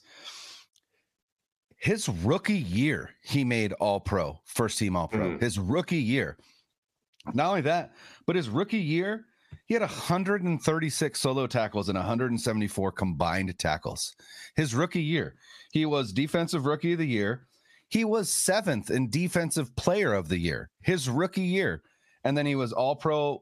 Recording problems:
squashed, flat; somewhat

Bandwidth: 14.5 kHz